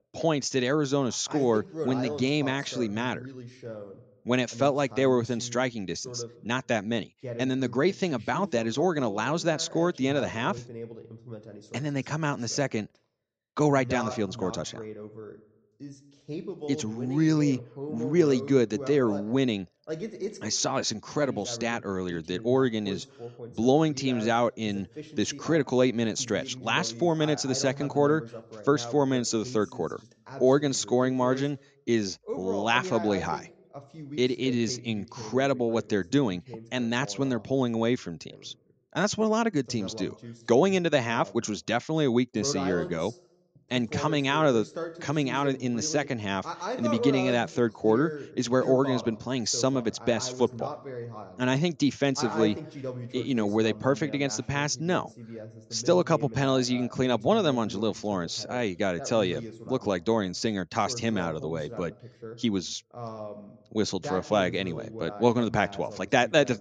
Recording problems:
voice in the background; noticeable; throughout; 15 dB below the speech

